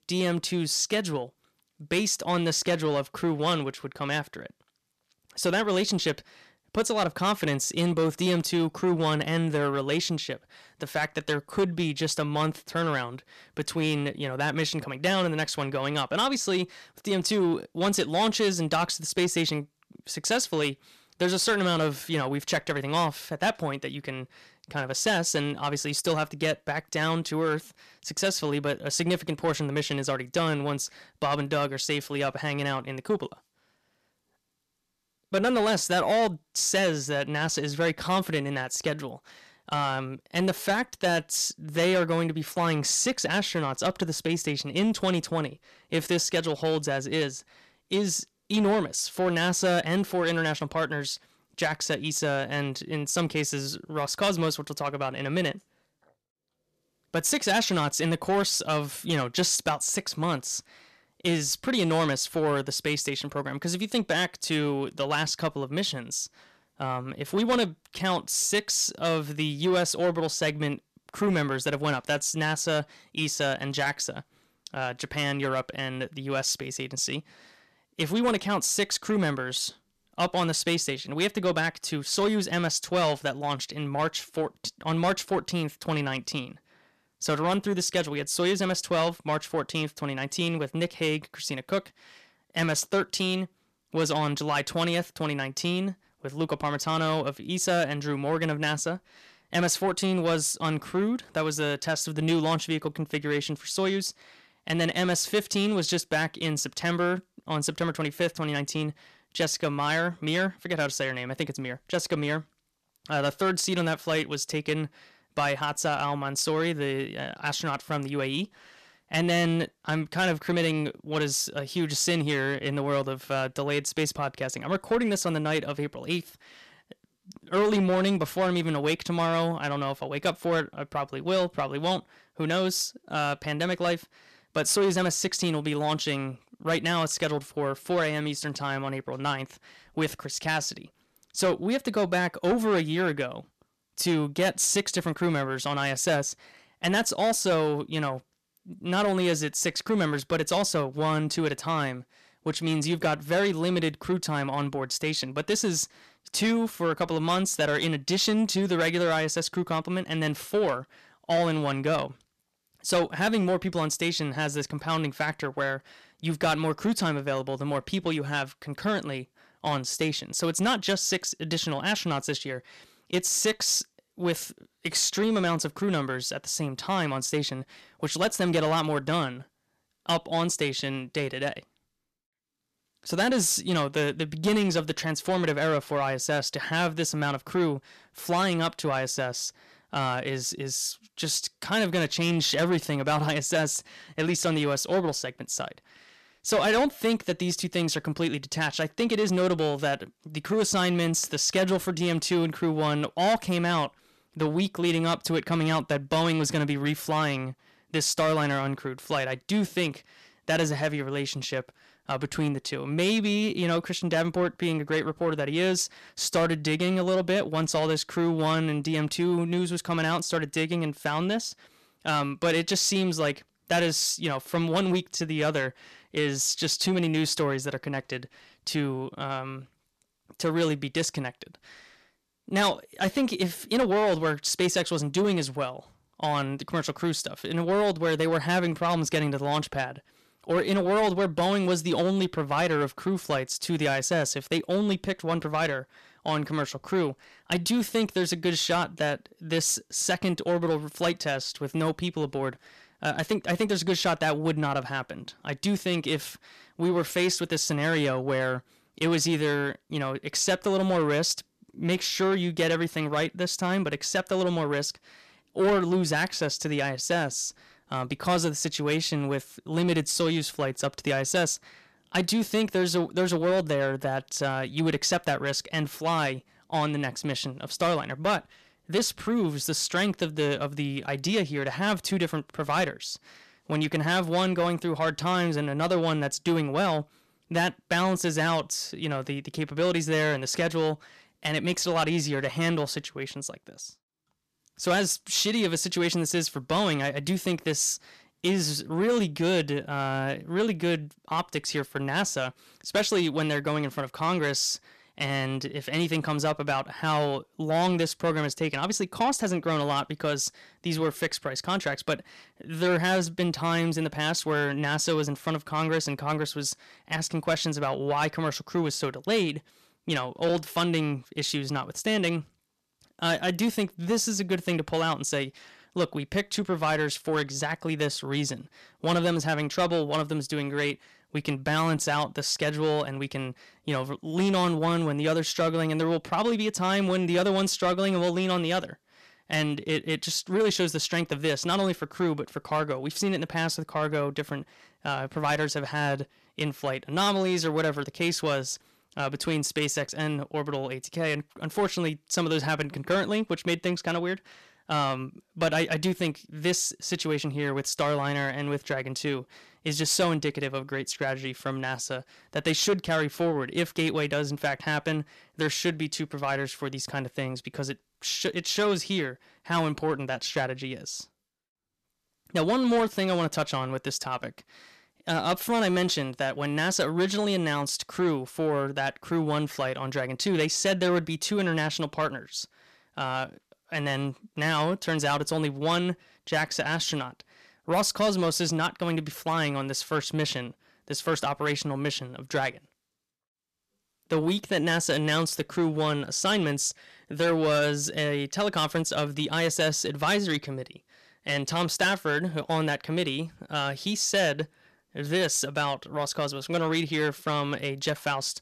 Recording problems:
distortion; slight; 10 dB below the speech

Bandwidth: 14 kHz